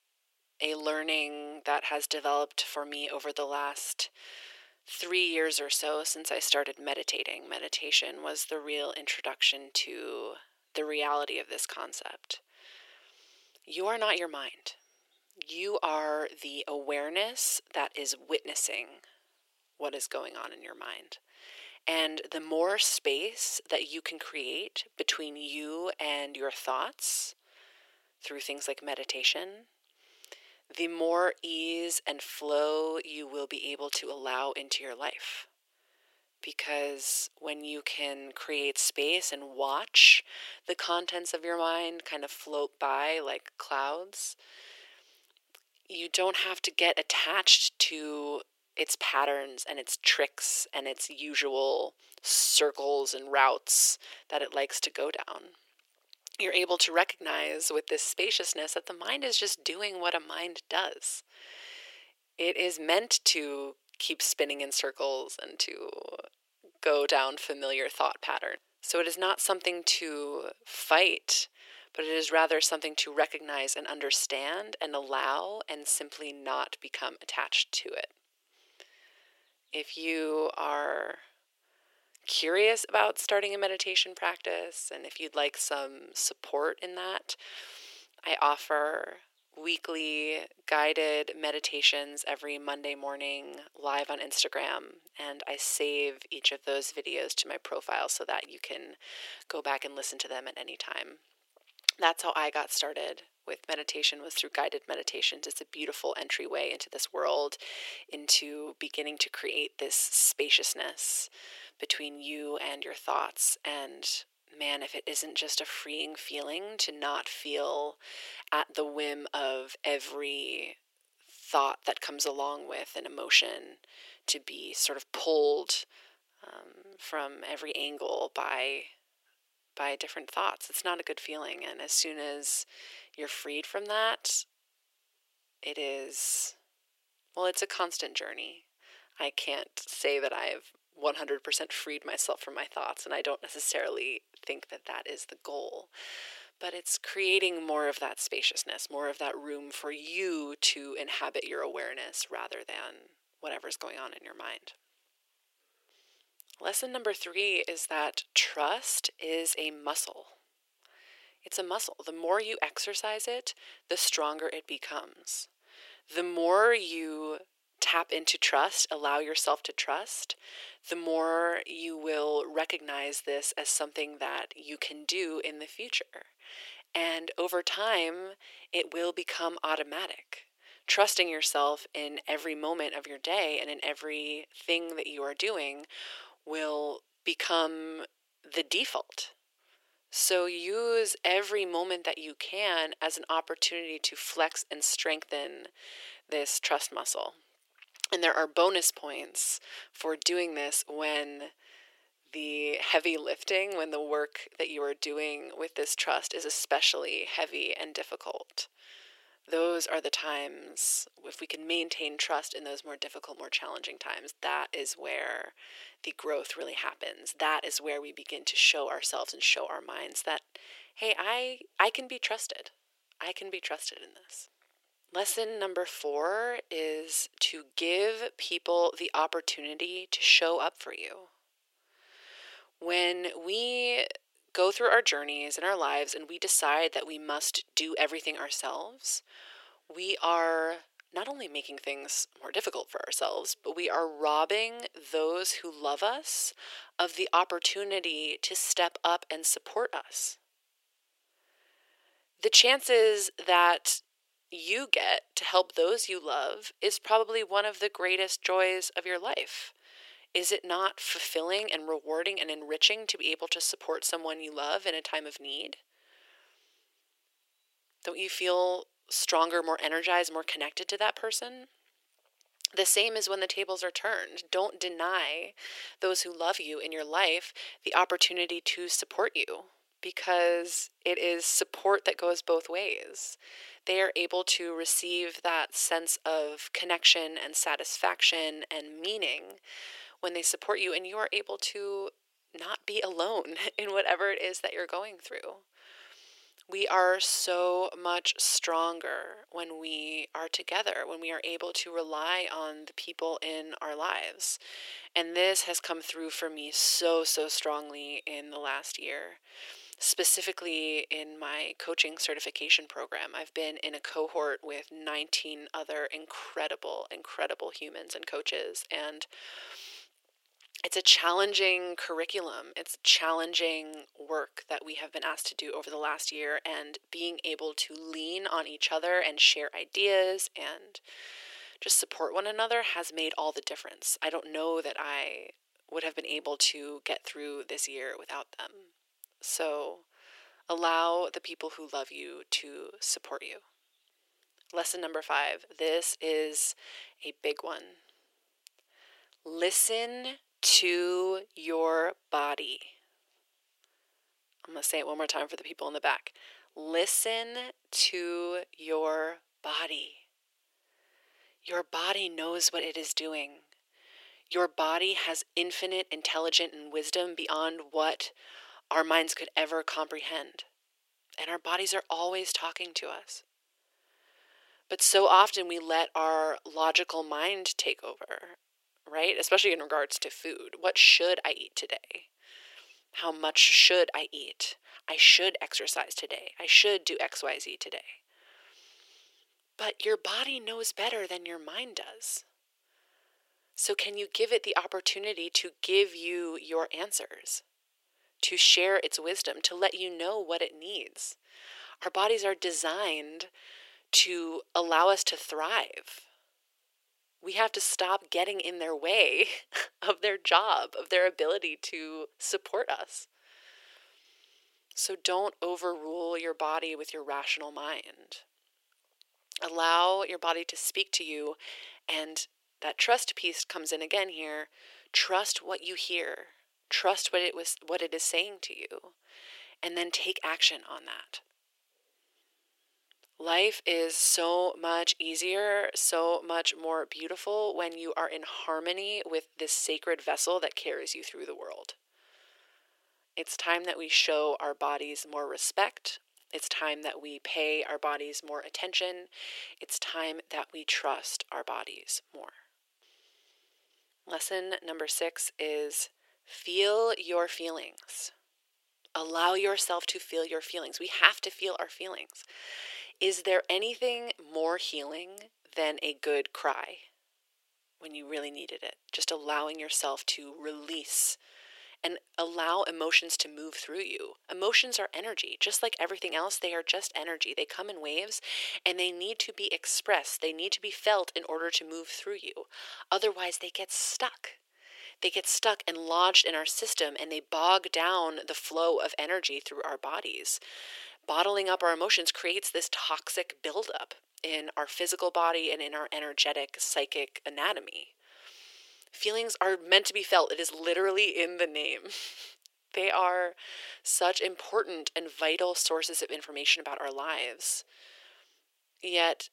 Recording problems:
thin; very; fading below 400 Hz

